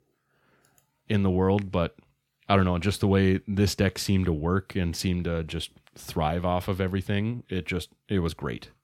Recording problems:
none

